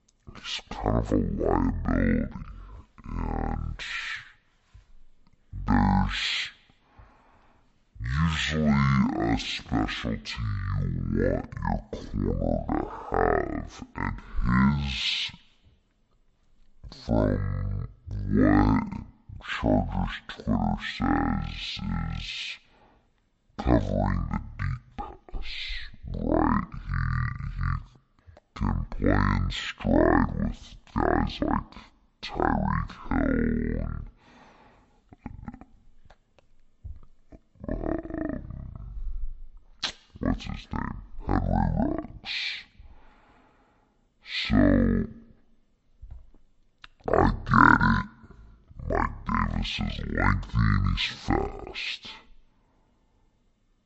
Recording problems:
wrong speed and pitch; too slow and too low; 0.5 times normal speed

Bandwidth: 8 kHz